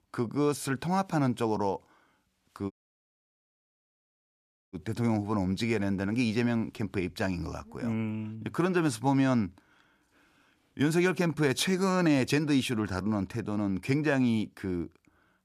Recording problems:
audio cutting out; at 2.5 s for 2 s

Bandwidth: 14.5 kHz